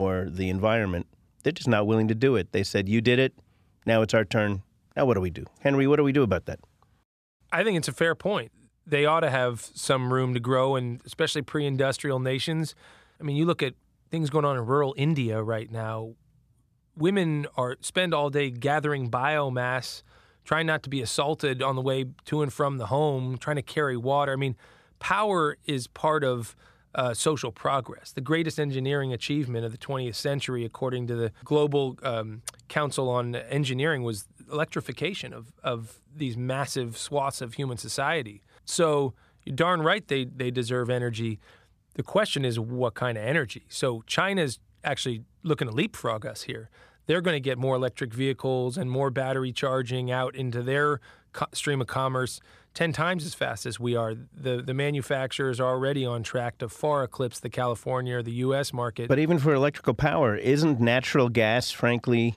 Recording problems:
abrupt cut into speech; at the start

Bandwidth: 14.5 kHz